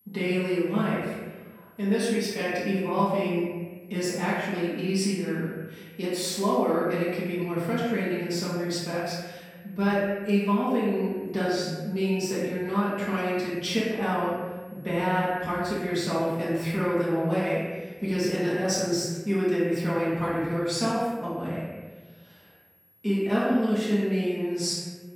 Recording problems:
room echo; strong; dies away in 1.2 s
off-mic speech; far
high-pitched whine; faint; throughout; 11.5 kHz, 30 dB below the speech

